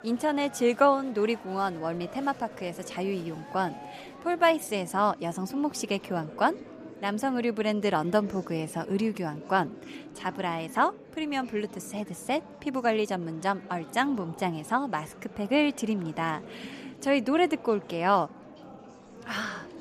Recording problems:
murmuring crowd; noticeable; throughout; 15 dB below the speech

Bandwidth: 14.5 kHz